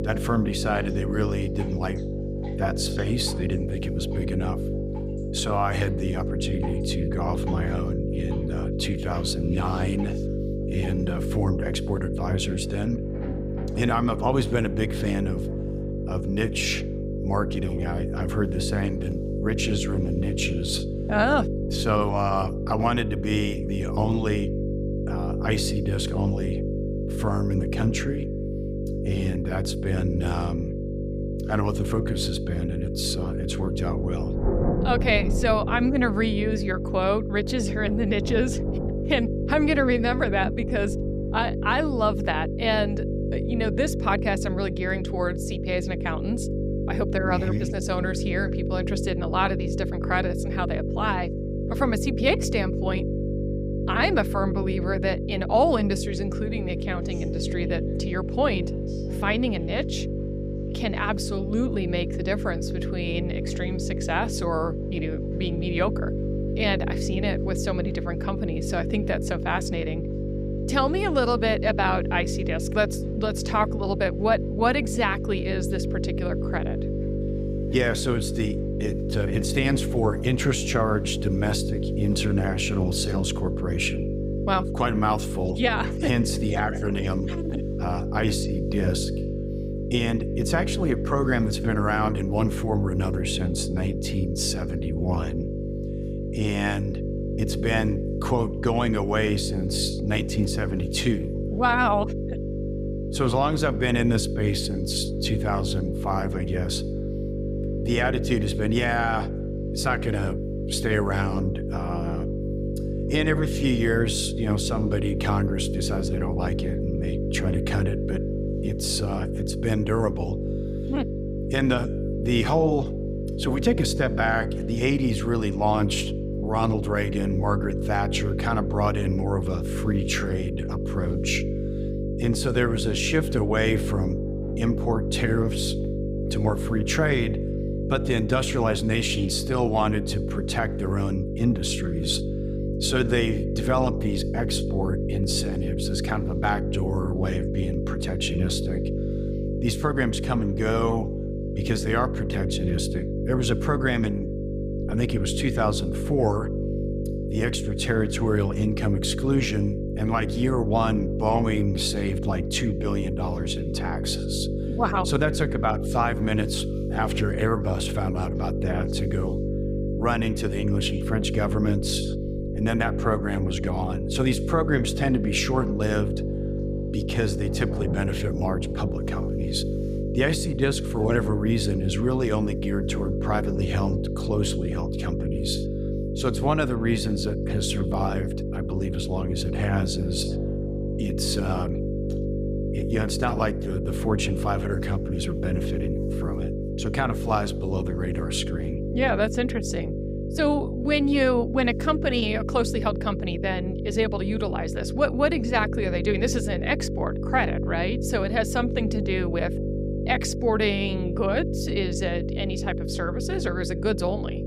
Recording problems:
electrical hum; loud; throughout; 50 Hz, 7 dB below the speech
rain or running water; noticeable; throughout; 15 dB below the speech

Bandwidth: 15.5 kHz